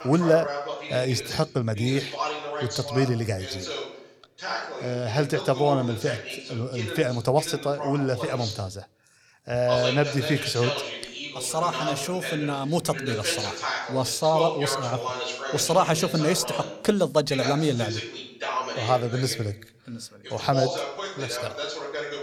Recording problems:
voice in the background; loud; throughout; 6 dB below the speech

